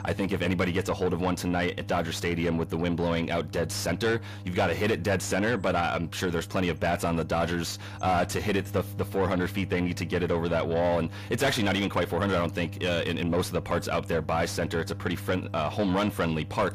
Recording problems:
distortion; heavy; 7 dB below the speech
electrical hum; faint; throughout; 50 Hz, 25 dB below the speech

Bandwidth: 15 kHz